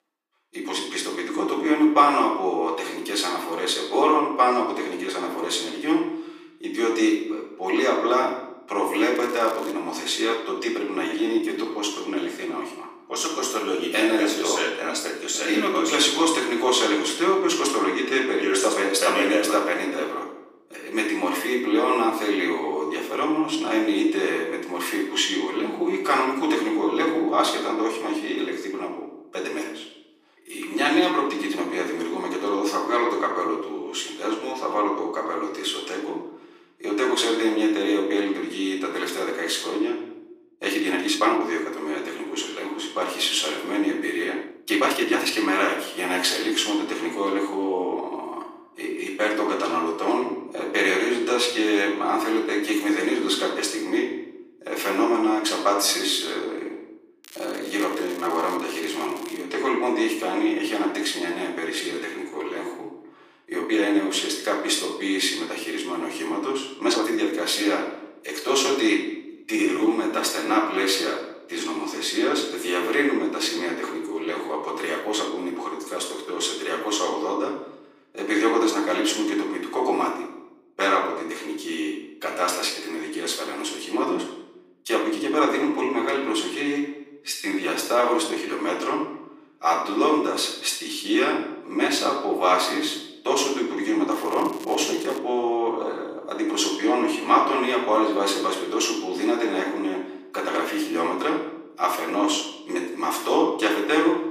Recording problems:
off-mic speech; far
thin; very; fading below 300 Hz
room echo; noticeable; dies away in 0.7 s
crackling; noticeable; at 9 s, from 57 to 59 s and from 1:34 to 1:35; 20 dB below the speech
uneven, jittery; strongly; from 11 s to 1:35

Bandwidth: 15 kHz